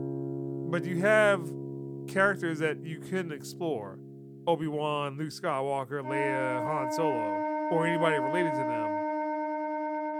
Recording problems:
background music; loud; throughout; 3 dB below the speech

